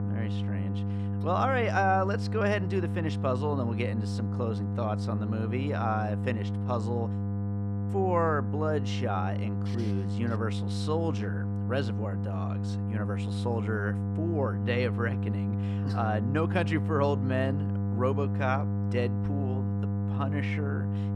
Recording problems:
electrical hum; loud; throughout; 50 Hz, 9 dB below the speech

